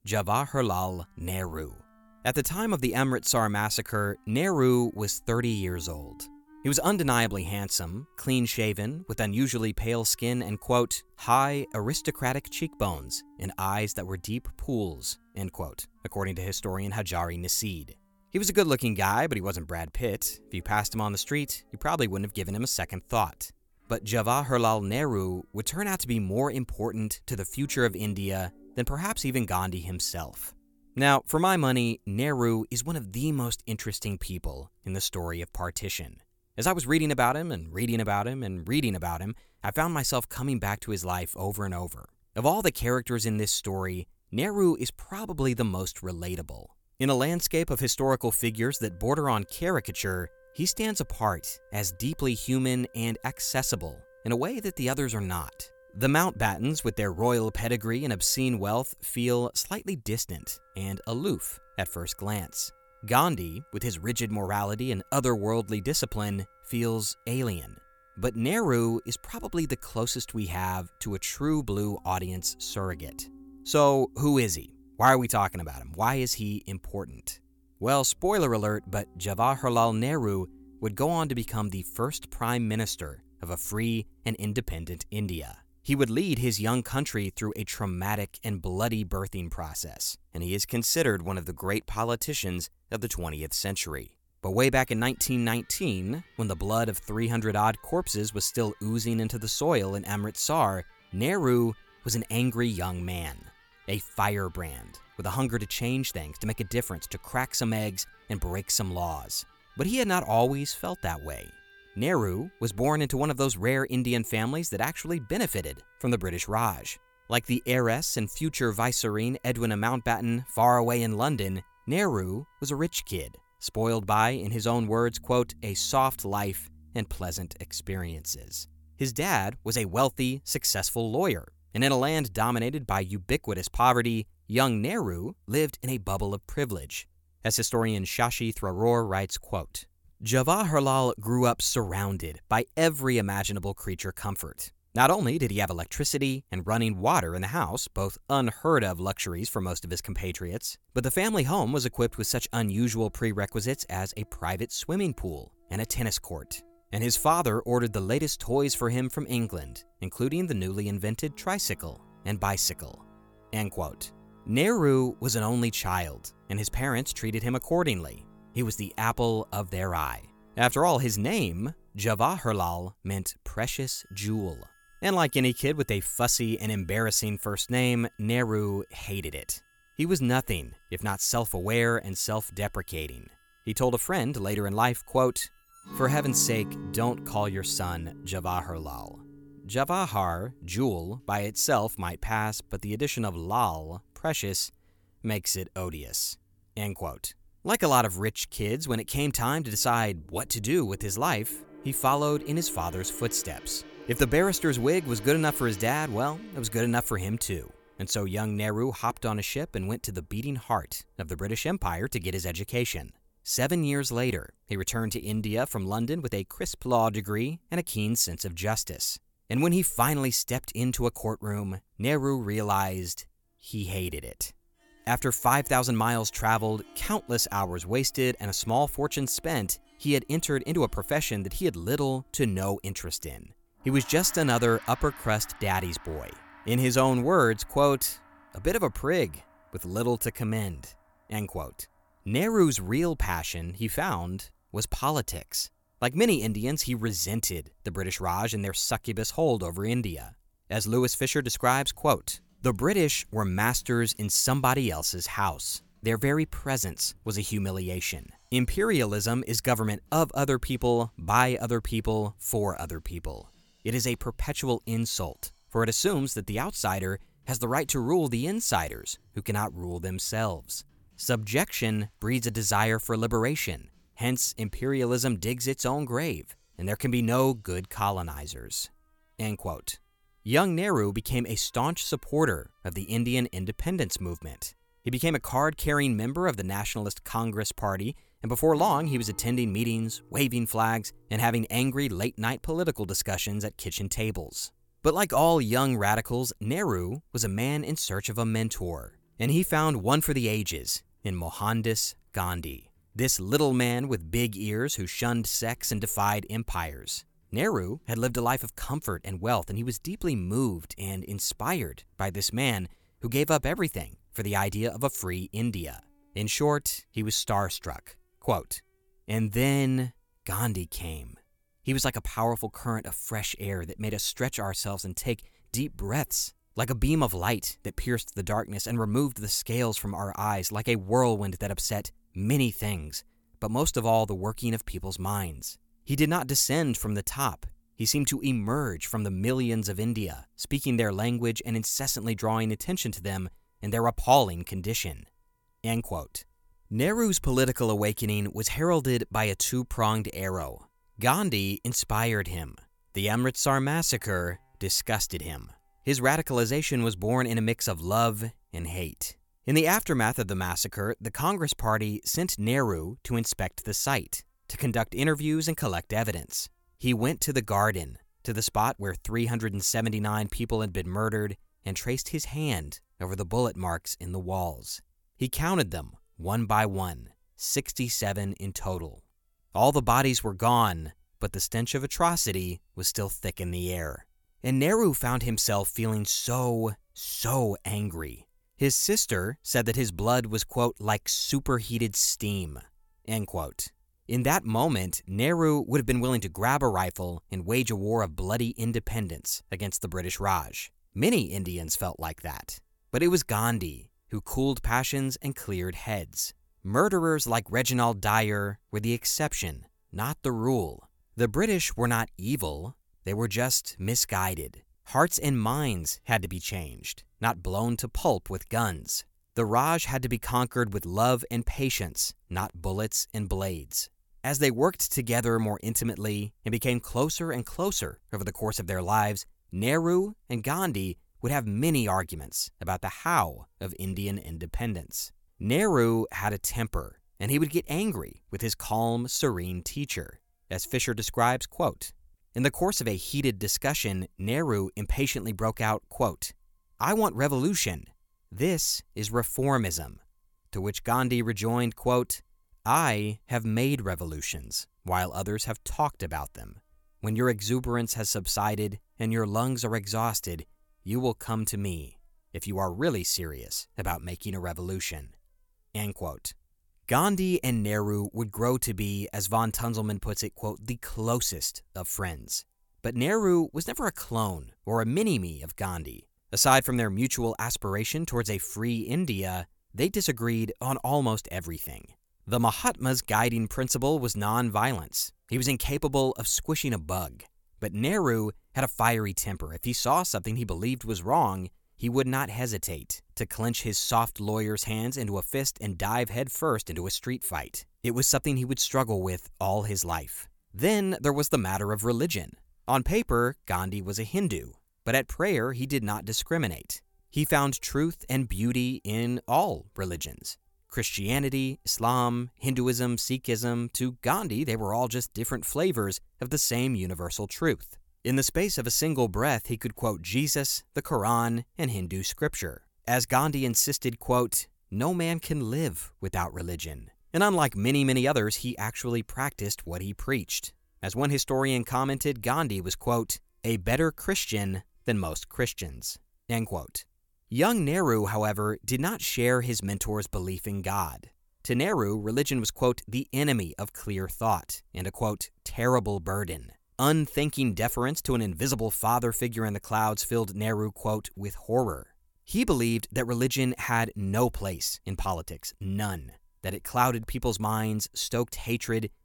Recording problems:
background music; faint; throughout; 25 dB below the speech

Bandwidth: 18 kHz